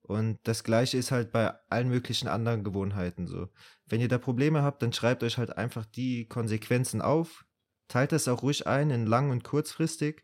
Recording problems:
none

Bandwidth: 16 kHz